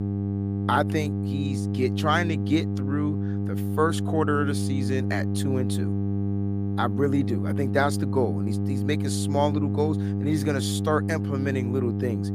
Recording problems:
electrical hum; loud; throughout; 50 Hz, 7 dB below the speech

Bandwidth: 15 kHz